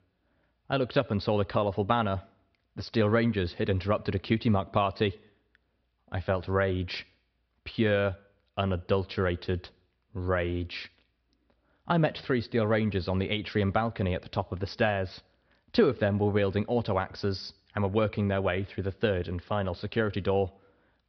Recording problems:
high frequencies cut off; noticeable; nothing above 5.5 kHz

